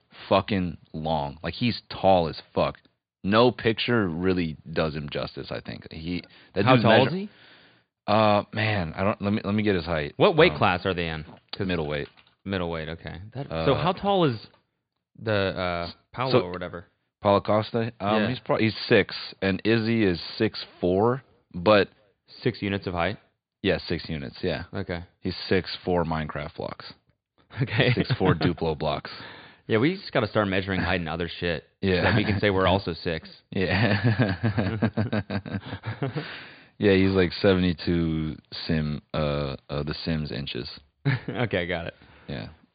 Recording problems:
high frequencies cut off; severe; nothing above 5 kHz

